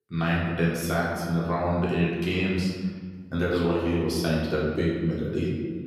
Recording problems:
off-mic speech; far
room echo; noticeable; dies away in 1.5 s

